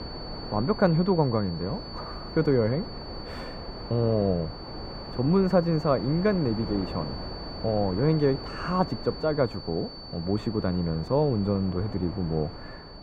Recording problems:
muffled; very; fading above 2.5 kHz
high-pitched whine; noticeable; throughout; 4.5 kHz, 15 dB below the speech
wind noise on the microphone; occasional gusts; 15 dB below the speech

